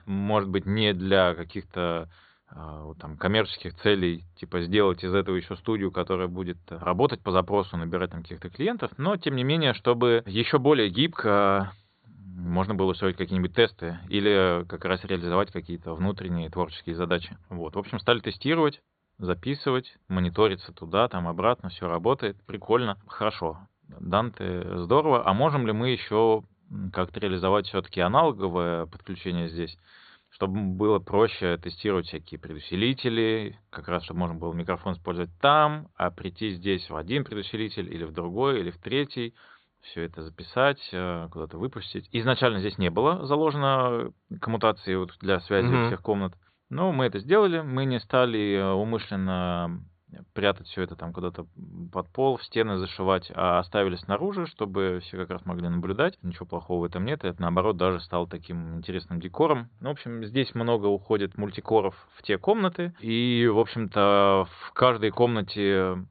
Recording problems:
high frequencies cut off; severe; nothing above 4.5 kHz

